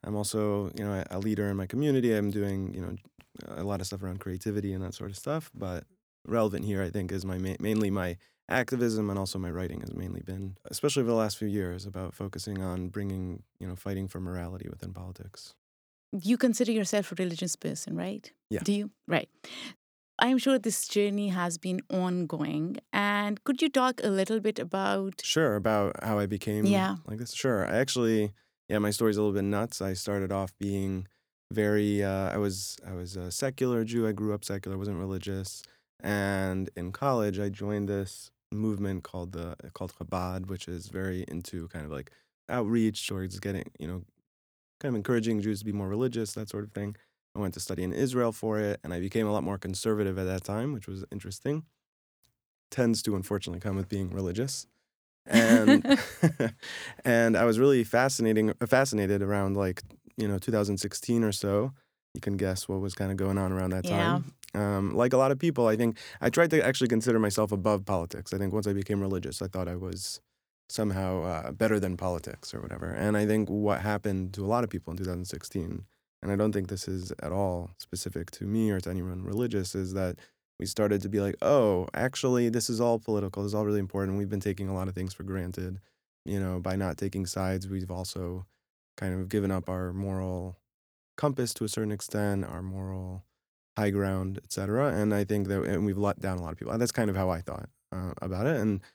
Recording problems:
none

